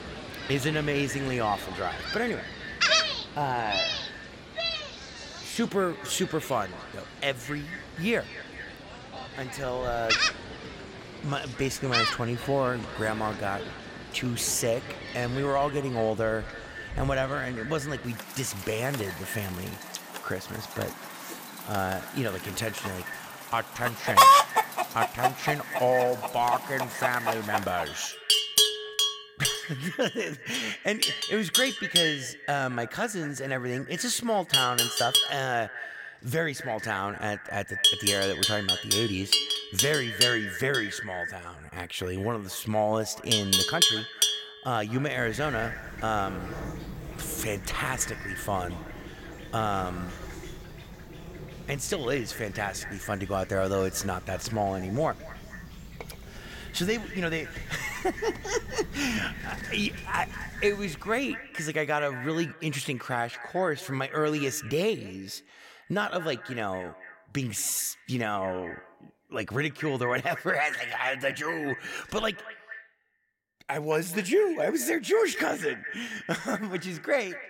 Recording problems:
echo of what is said; strong; throughout; 220 ms later, 10 dB below the speech
animal sounds; very loud; until 1:01; 3 dB above the speech

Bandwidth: 16.5 kHz